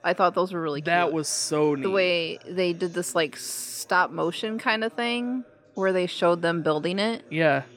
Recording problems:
background chatter; faint; throughout; 3 voices, 25 dB below the speech

